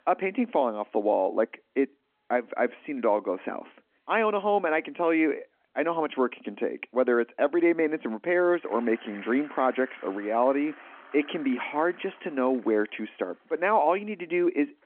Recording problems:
phone-call audio
traffic noise; faint; throughout; 20 dB below the speech

